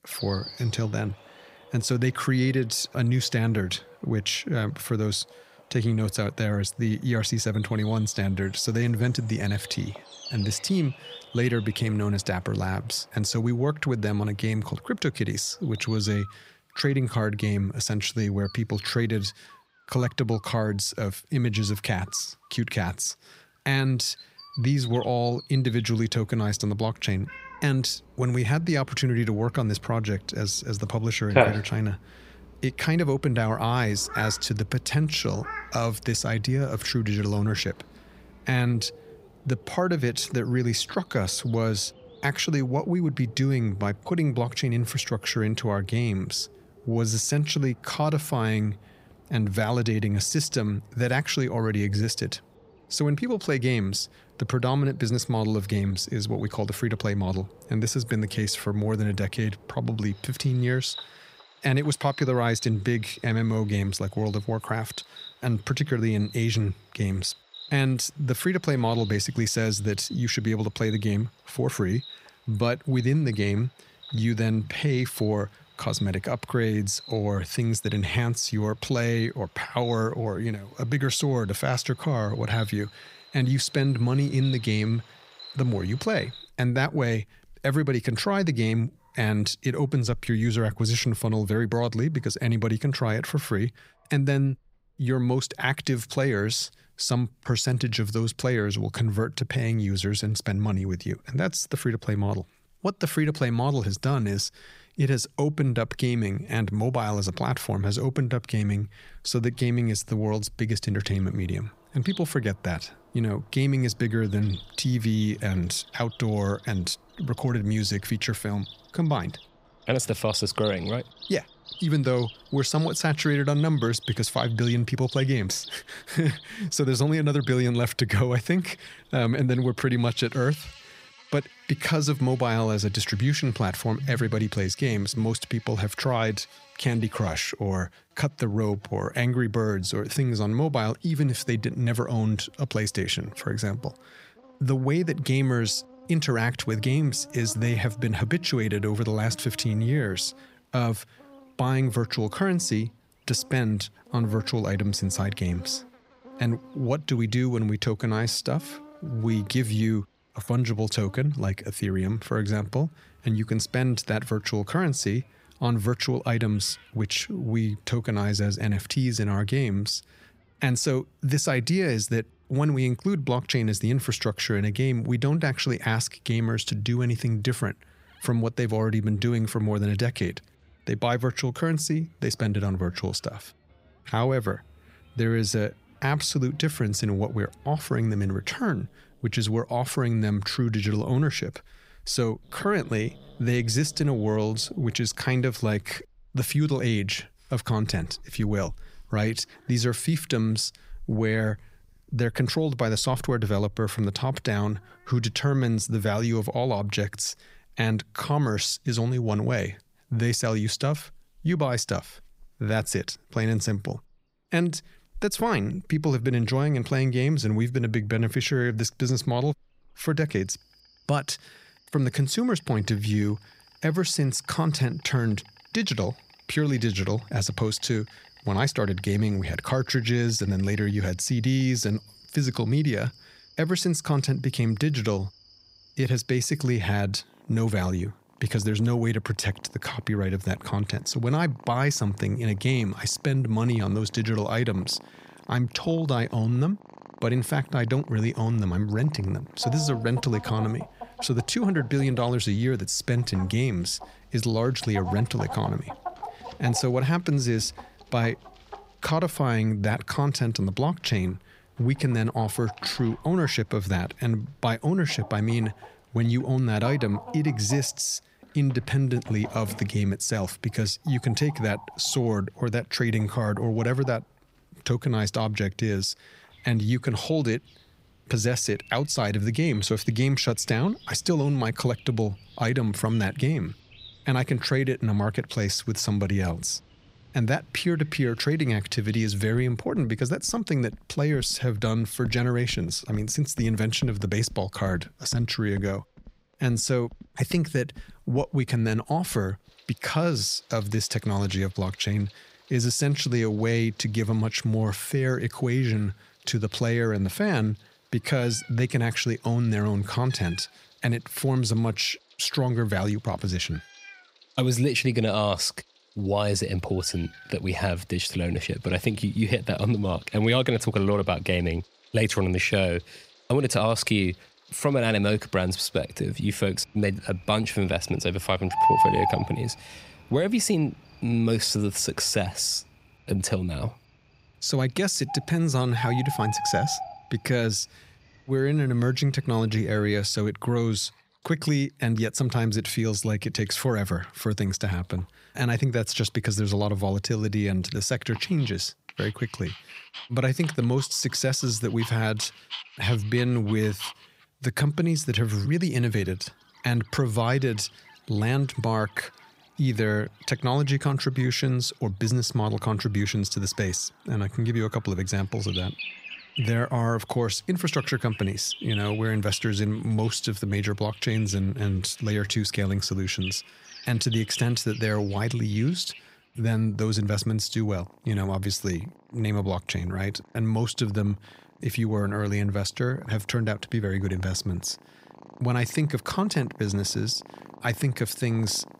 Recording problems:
animal sounds; noticeable; throughout; 15 dB below the speech

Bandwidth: 15.5 kHz